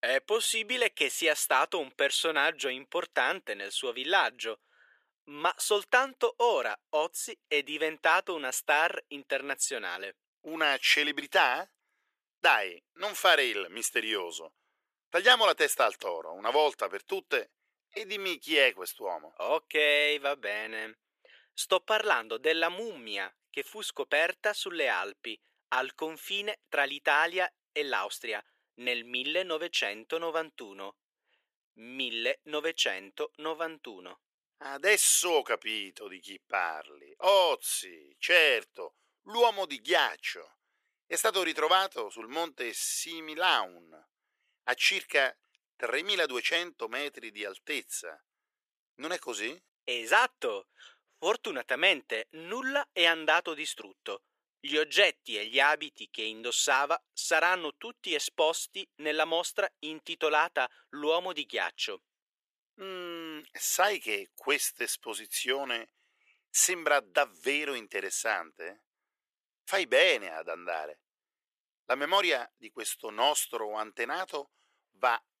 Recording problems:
thin; very; fading below 450 Hz

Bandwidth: 14.5 kHz